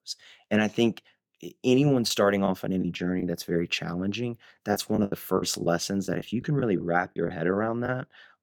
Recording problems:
choppy; very; from 4.5 to 8 s; 9% of the speech affected

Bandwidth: 17.5 kHz